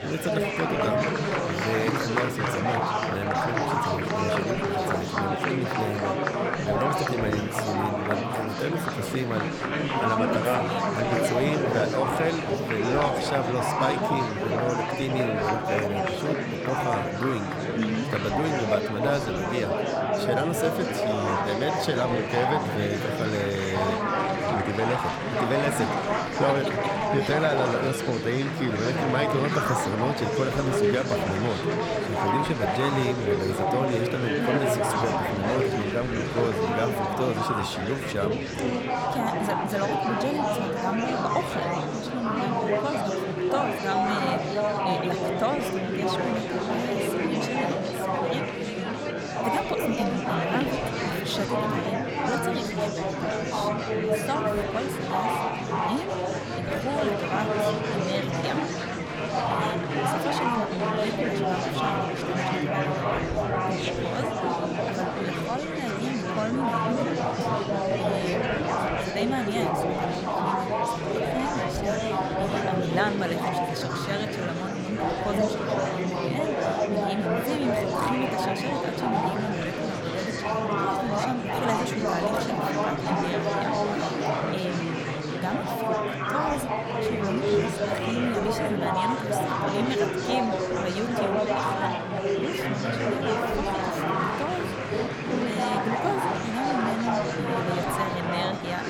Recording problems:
murmuring crowd; very loud; throughout; 4 dB above the speech

